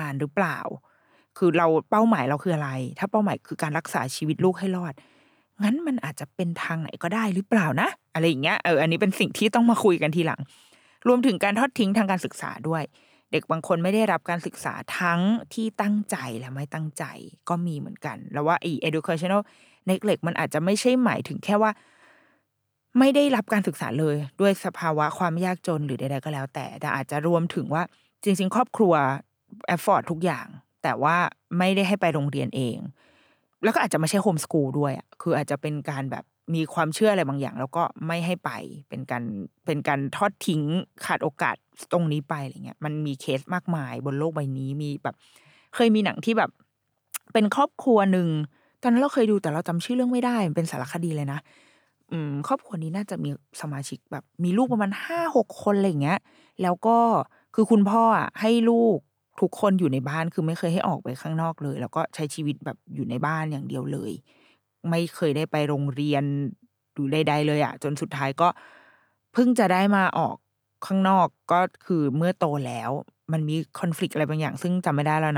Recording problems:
abrupt cut into speech; at the start and the end

